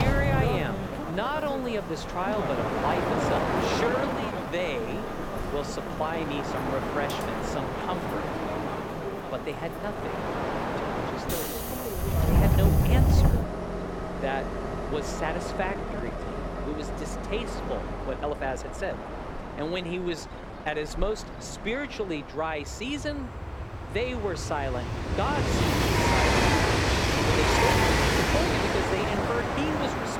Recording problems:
train or aircraft noise; very loud; throughout; 5 dB above the speech
abrupt cut into speech; at the start
uneven, jittery; strongly; from 1 to 30 s

